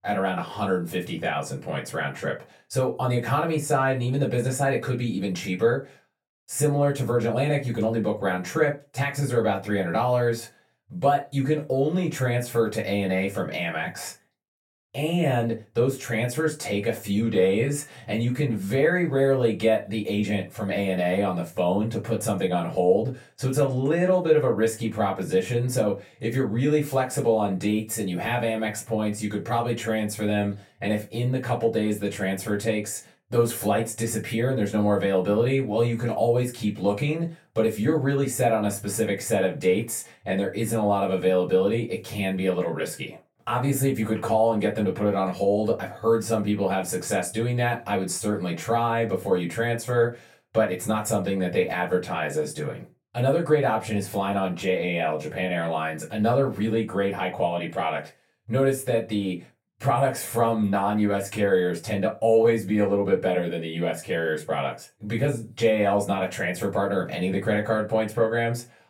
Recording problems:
off-mic speech; far
room echo; very slight; dies away in 0.2 s

